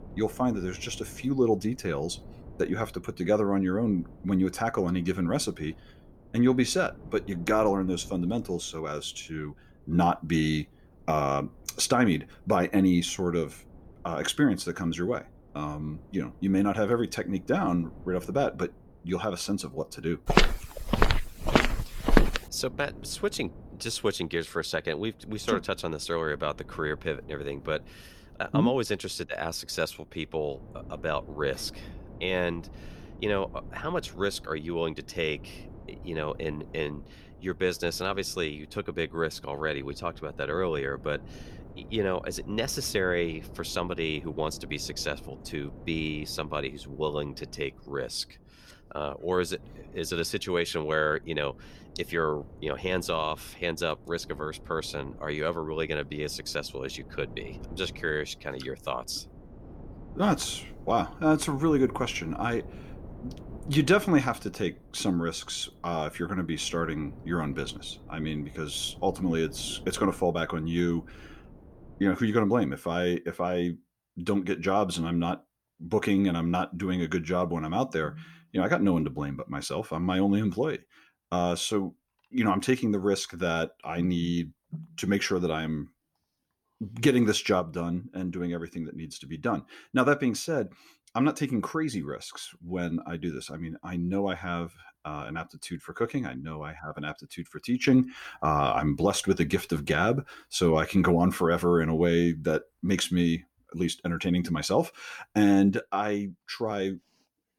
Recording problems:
wind noise on the microphone; occasional gusts; until 1:12; 25 dB below the speech
footsteps; loud; from 20 to 22 s; peak 5 dB above the speech

